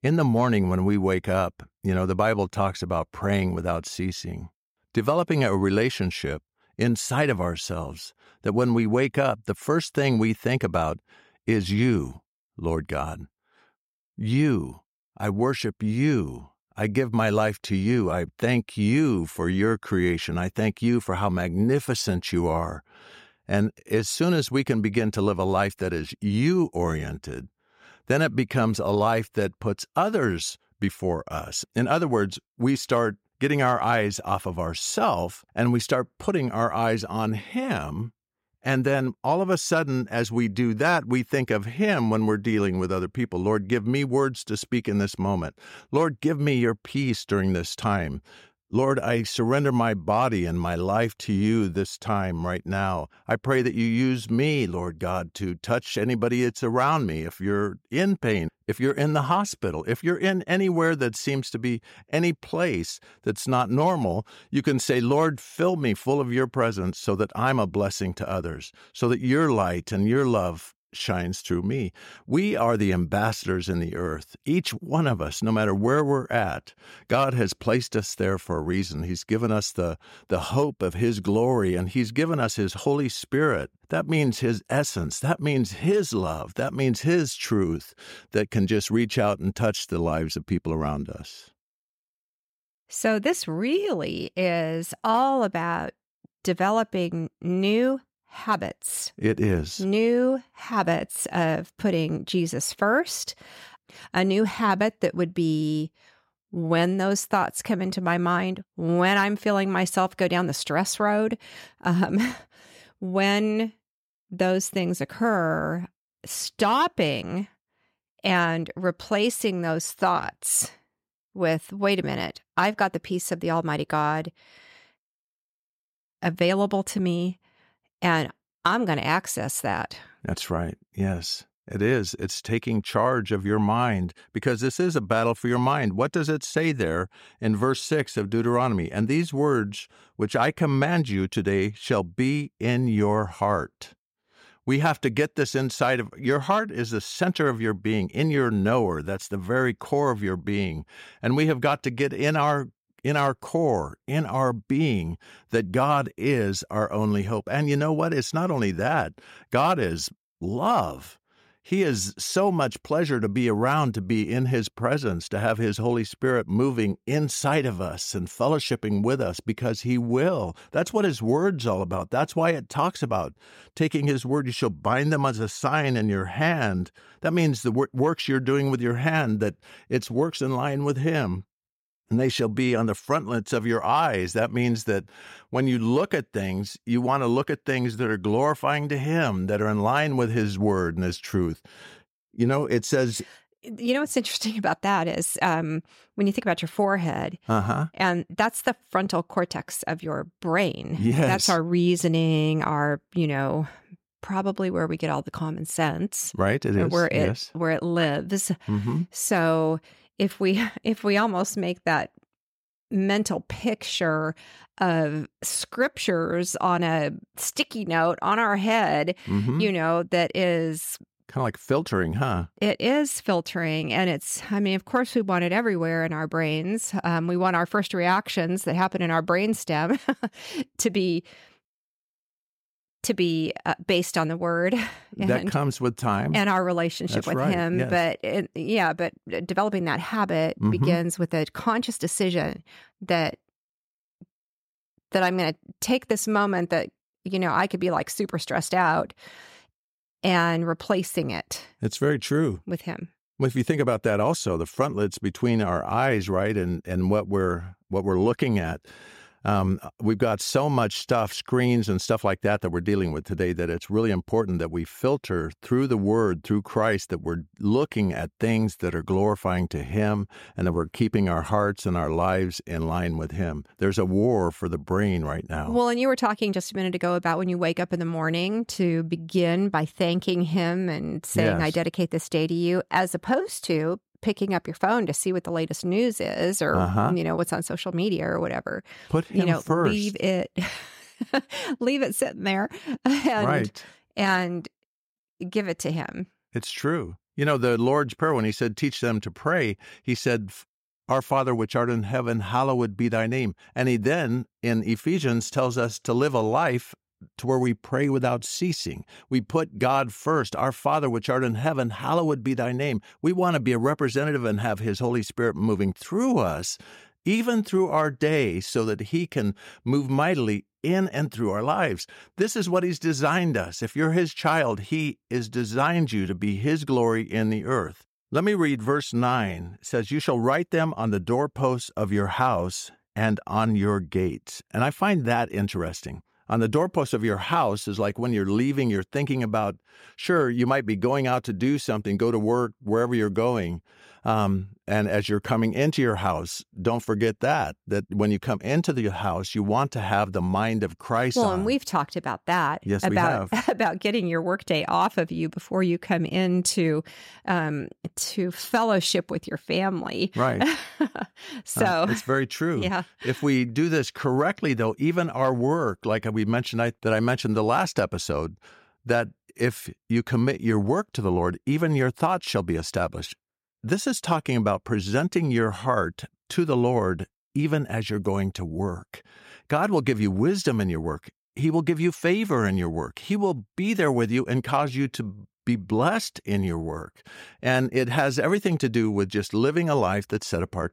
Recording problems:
none

